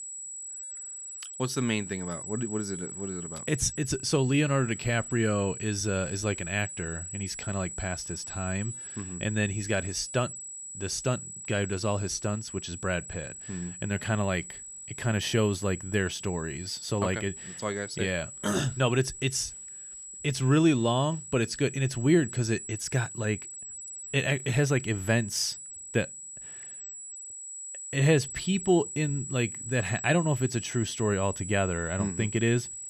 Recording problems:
high-pitched whine; loud; throughout; 8 kHz, 9 dB below the speech

